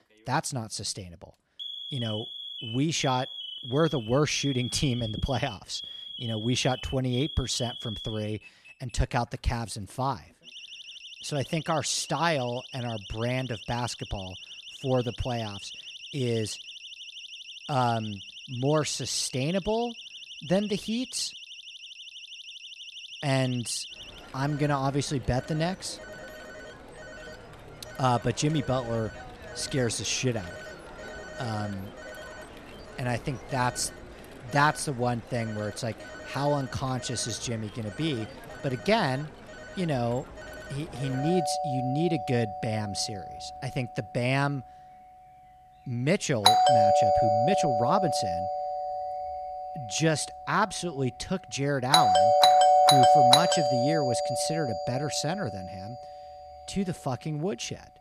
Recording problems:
alarms or sirens; very loud; throughout; 1 dB above the speech

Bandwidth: 14 kHz